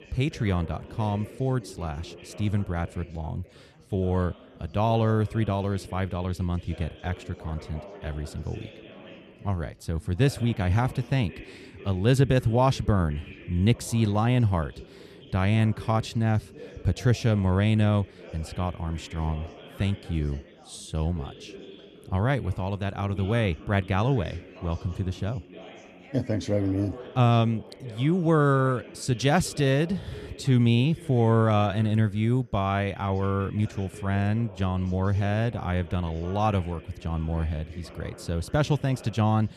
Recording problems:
background chatter; noticeable; throughout; 3 voices, 20 dB below the speech

